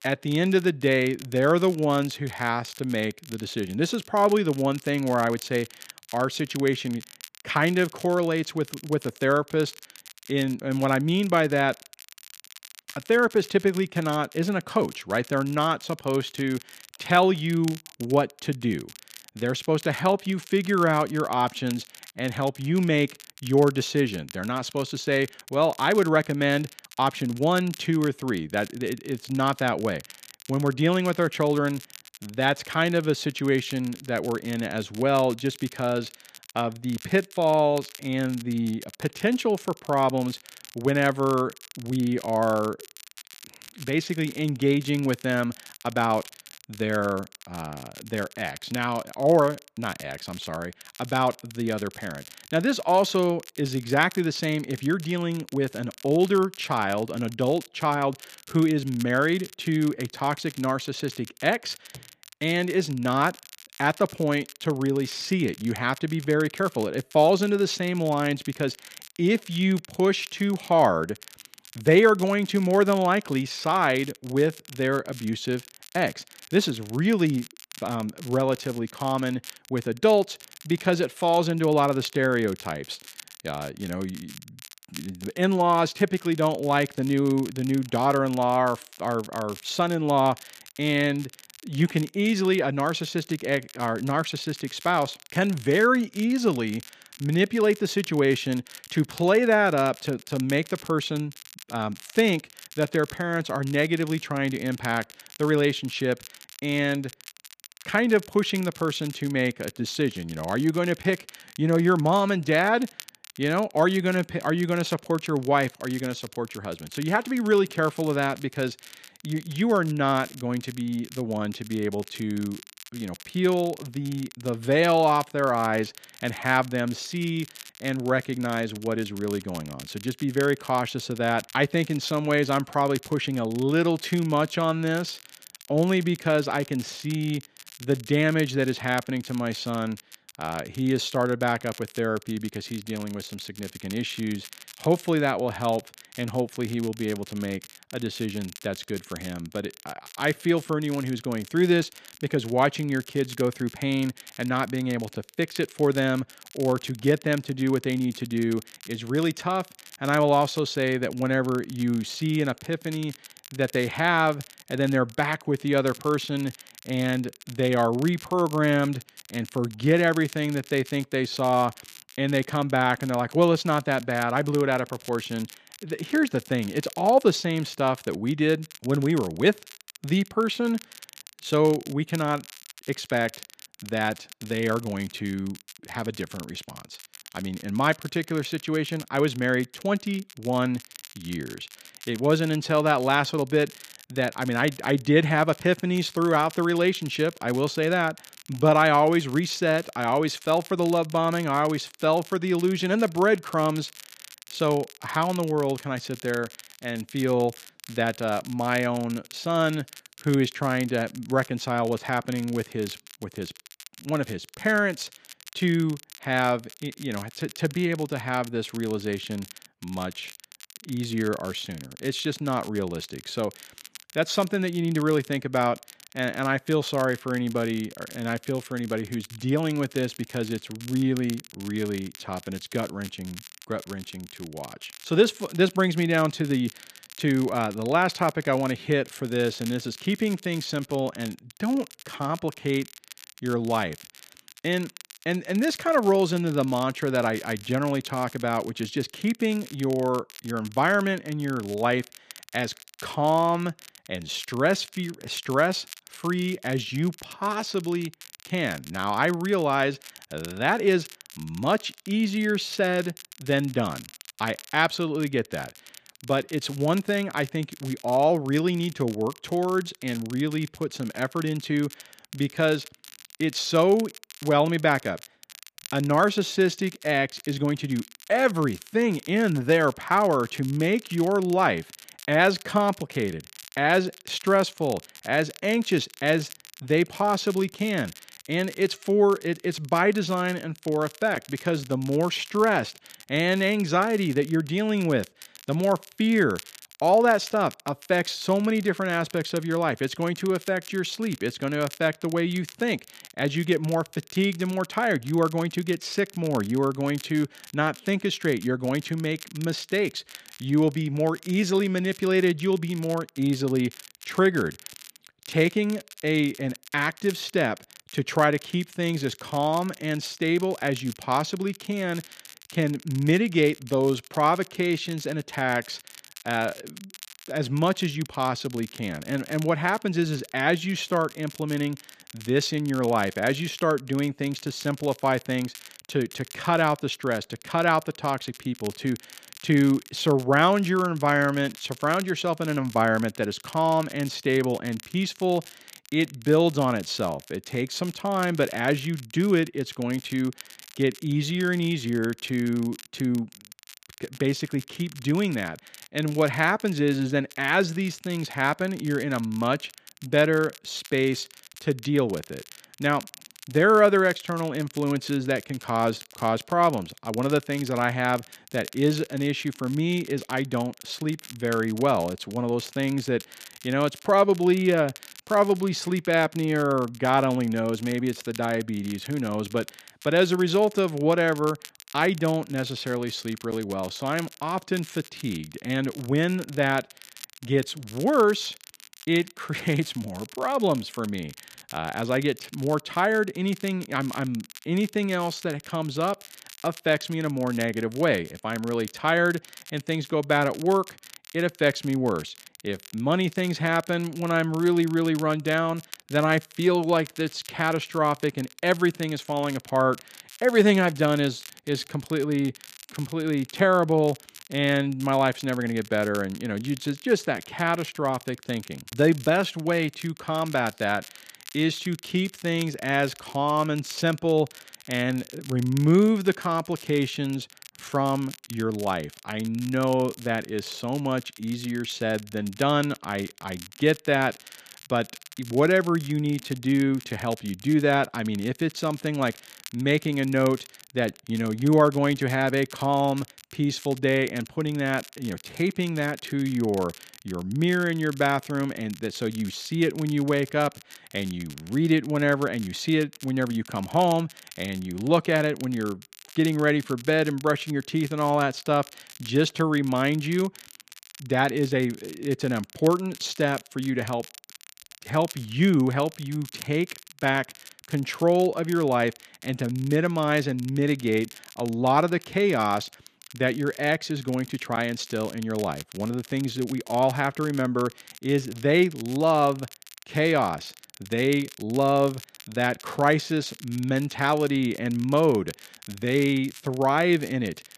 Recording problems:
crackle, like an old record; noticeable; 20 dB below the speech

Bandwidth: 14.5 kHz